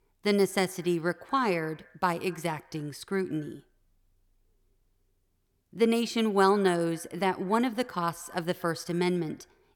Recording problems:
echo of what is said; faint; throughout; 110 ms later, 25 dB below the speech

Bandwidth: 18.5 kHz